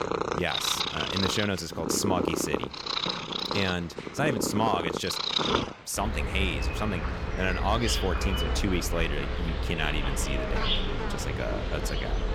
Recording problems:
animal sounds; very loud; throughout; as loud as the speech

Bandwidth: 17 kHz